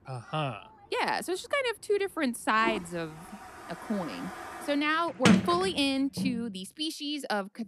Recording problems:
household noises; loud; throughout; 2 dB below the speech

